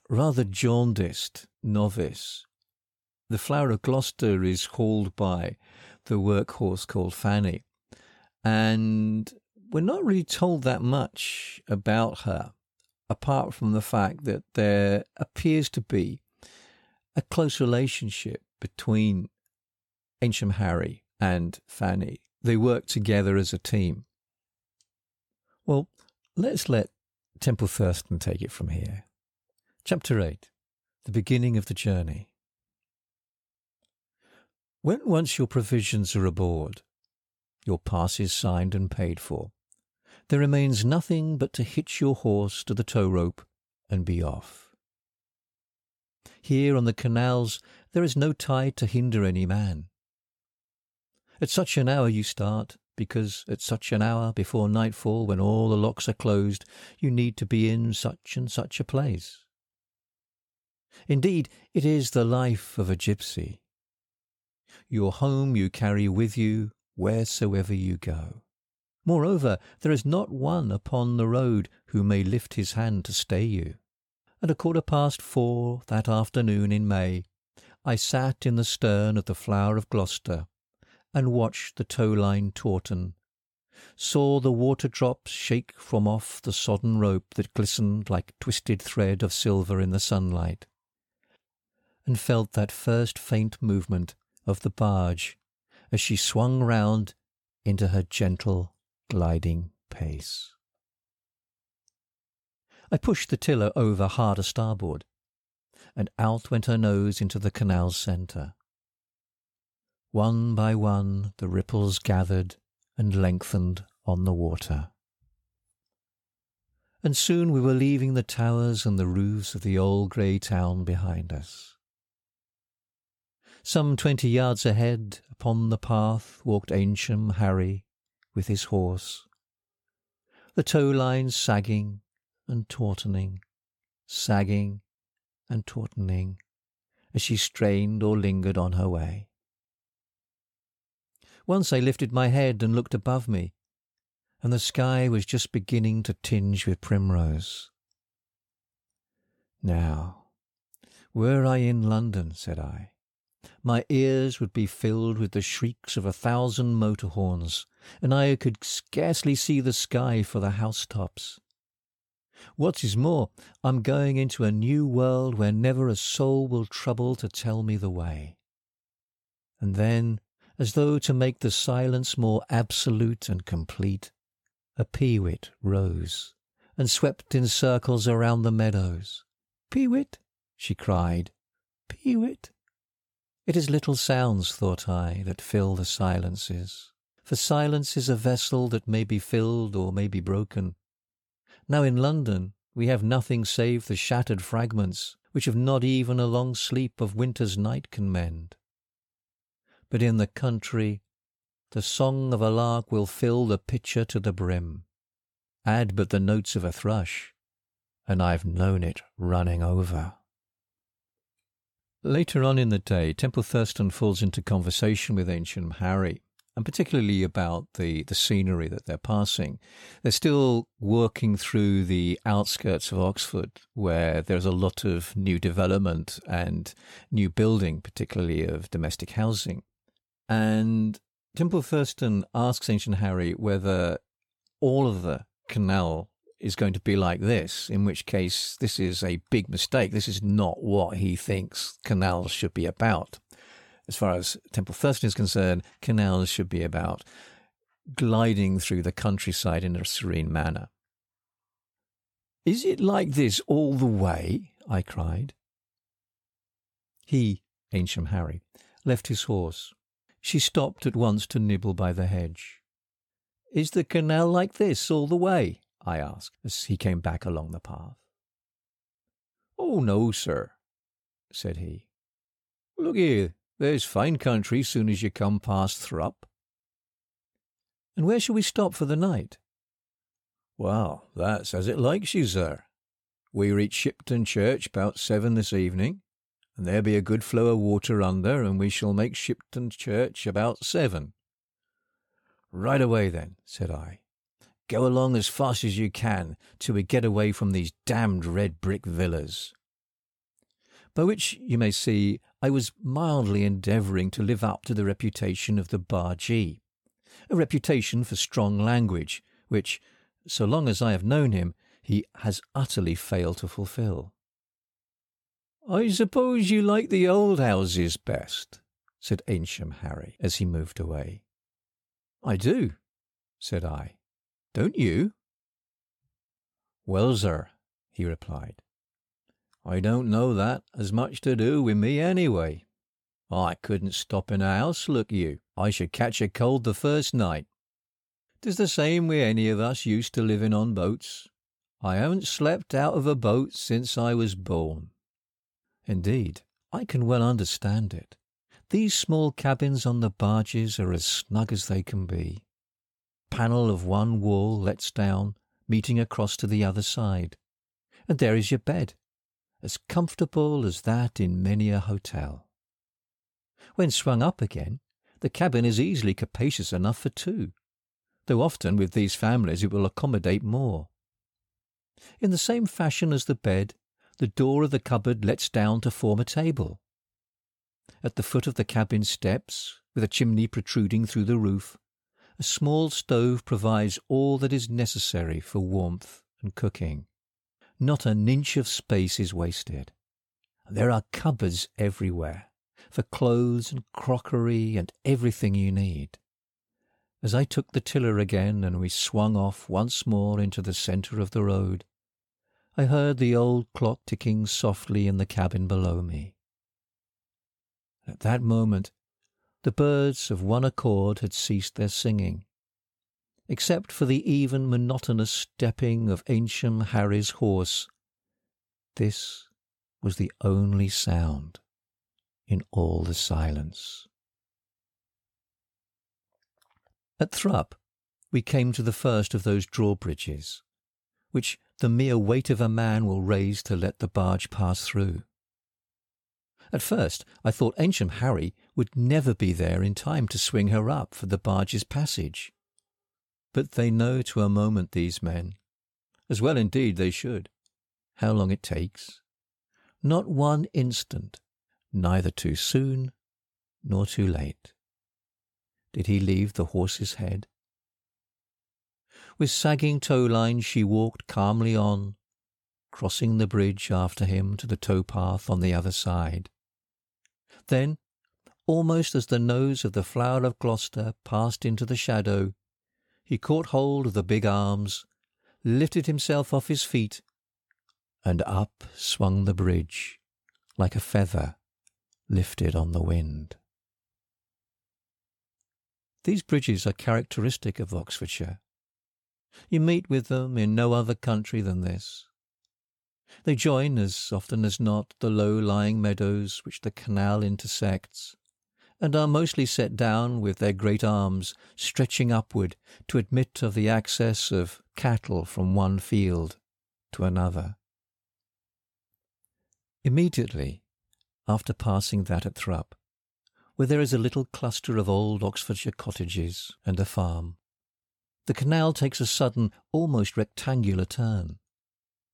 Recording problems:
none

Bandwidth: 17.5 kHz